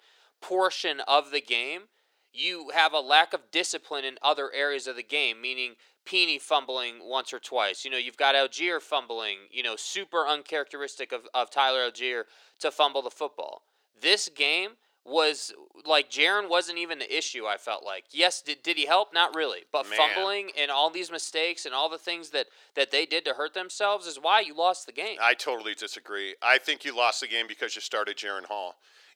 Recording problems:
thin; very; fading below 400 Hz

